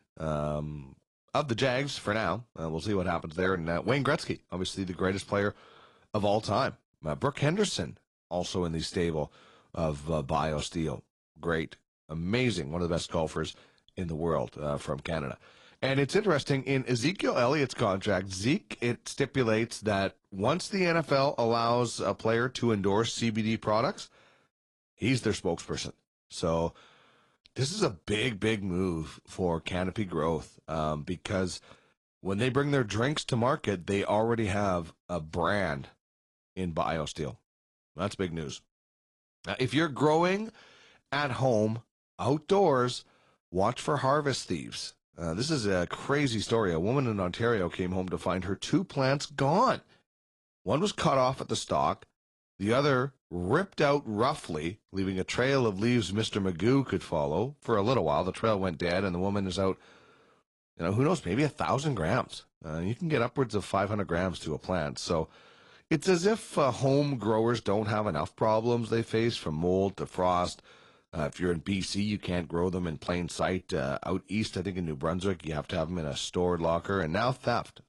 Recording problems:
garbled, watery; slightly

